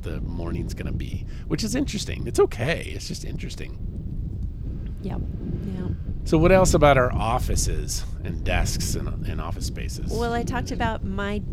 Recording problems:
wind noise on the microphone; occasional gusts; 20 dB below the speech

